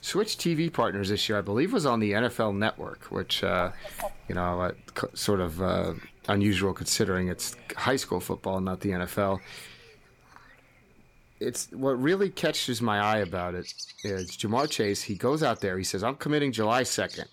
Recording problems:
animal sounds; noticeable; throughout; 20 dB below the speech

